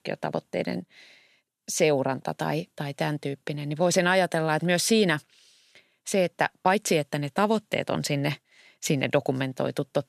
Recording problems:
none

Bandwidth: 14.5 kHz